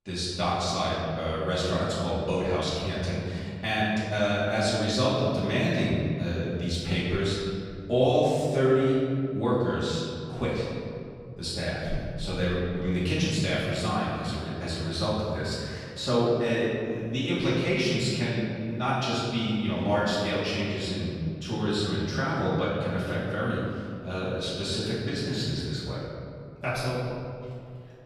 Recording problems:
room echo; strong; dies away in 2.4 s
off-mic speech; far

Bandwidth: 15 kHz